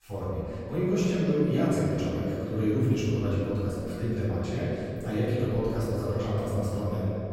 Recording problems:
room echo; strong; dies away in 3 s
off-mic speech; far

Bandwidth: 16 kHz